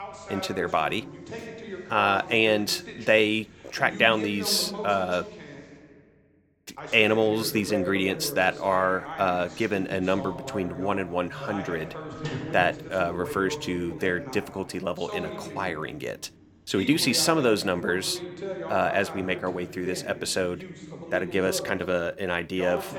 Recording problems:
voice in the background; noticeable; throughout; 10 dB below the speech

